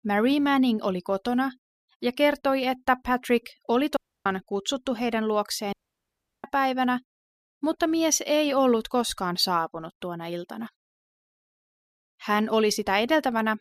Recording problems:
audio cutting out; at 4 s and at 5.5 s for 0.5 s

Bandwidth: 15 kHz